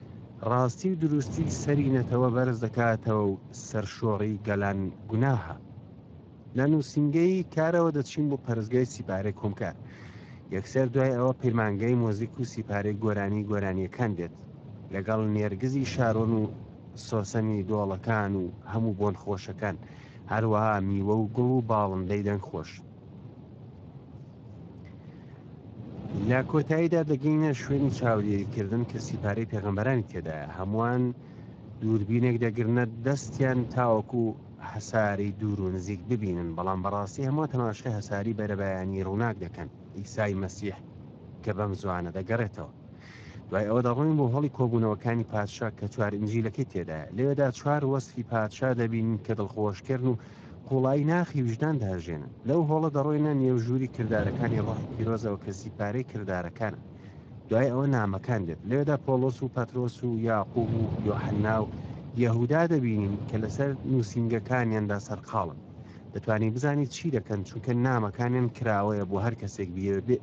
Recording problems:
garbled, watery; slightly
wind noise on the microphone; occasional gusts; 20 dB below the speech

